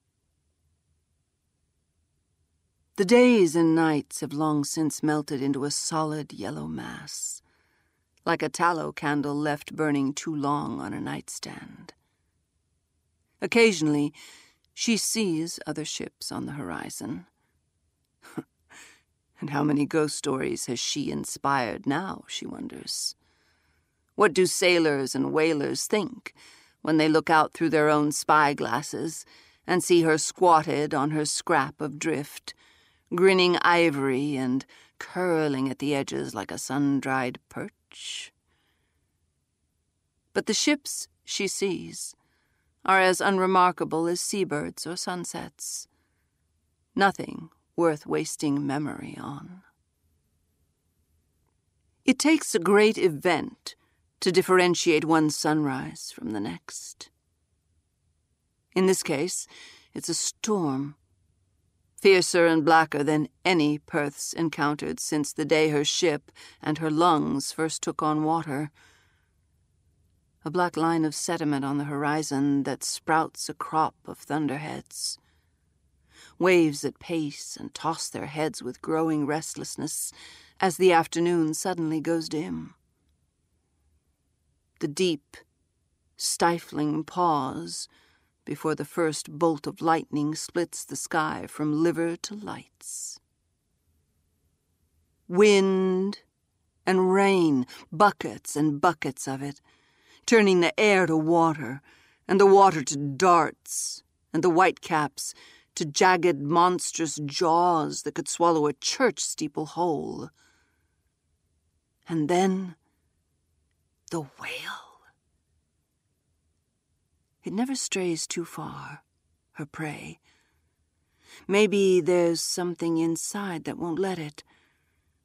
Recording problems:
none

